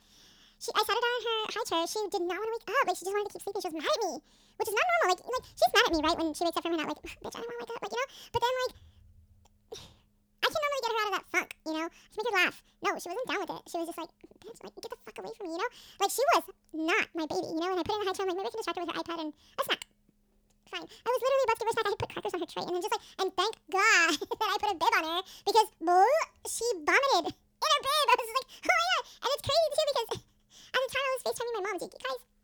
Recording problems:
wrong speed and pitch; too fast and too high; 1.7 times normal speed

